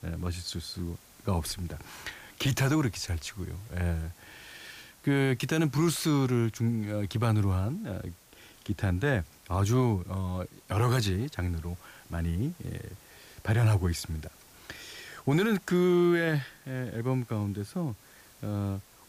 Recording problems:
hiss; faint; throughout; 25 dB below the speech

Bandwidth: 15 kHz